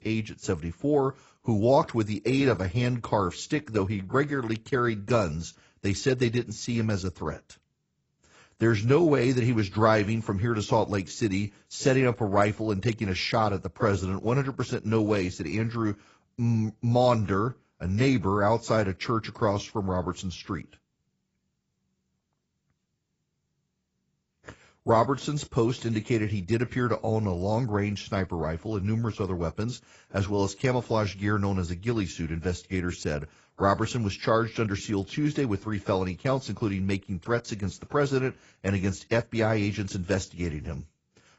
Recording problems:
garbled, watery; badly; nothing above 7.5 kHz

